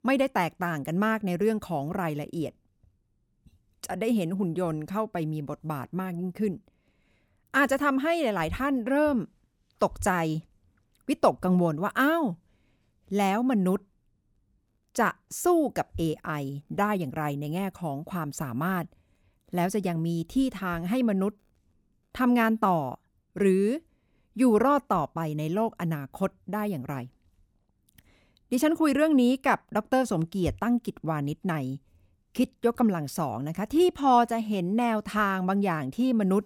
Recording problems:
none

